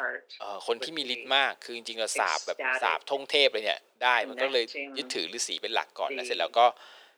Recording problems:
thin; very; fading below 400 Hz
voice in the background; loud; throughout; 8 dB below the speech

